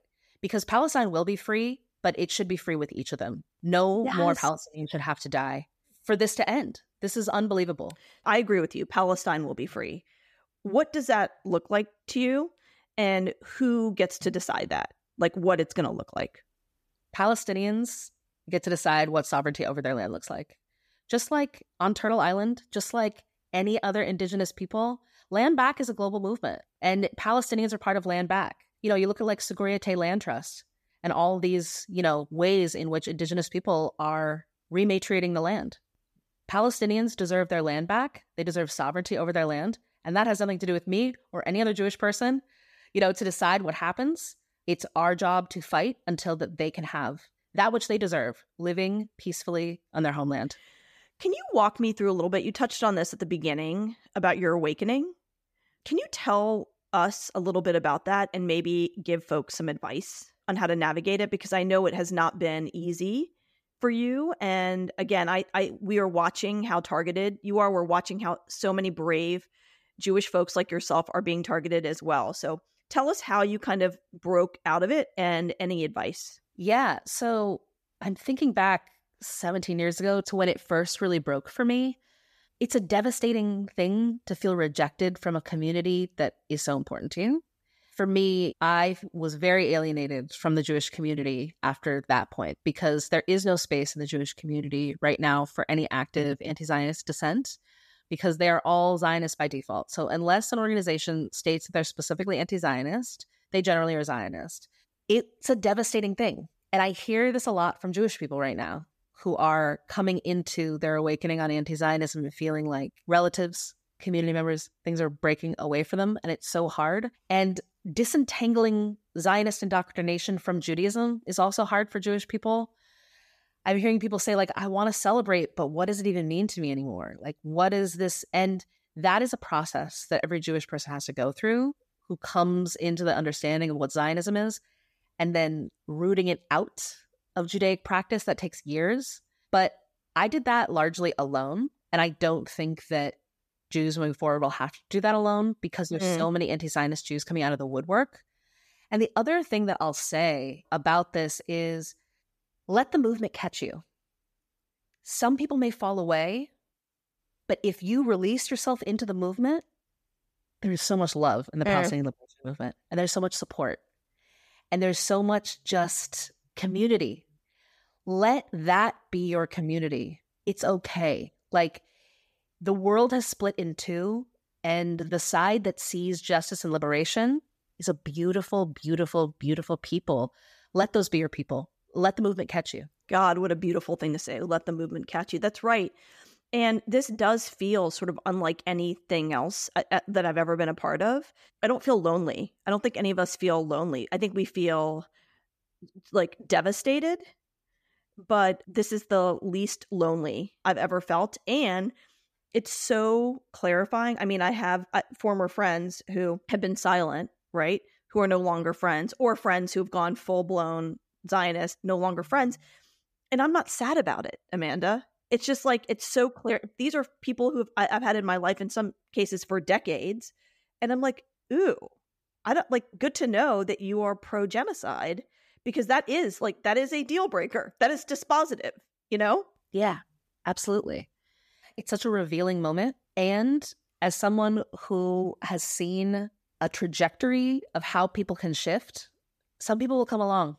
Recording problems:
none

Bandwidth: 14.5 kHz